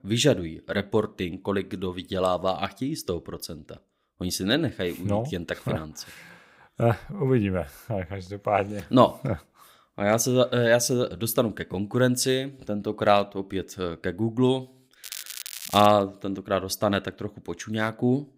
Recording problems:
crackling; noticeable; at 15 s, mostly in the pauses; 10 dB below the speech

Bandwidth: 15.5 kHz